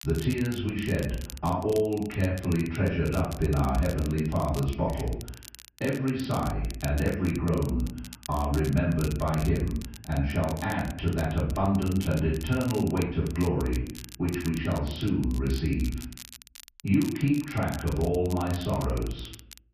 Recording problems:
off-mic speech; far
room echo; noticeable; dies away in 0.5 s
high frequencies cut off; noticeable; nothing above 5.5 kHz
muffled; very slightly; fading above 3 kHz
crackle, like an old record; noticeable; 15 dB below the speech

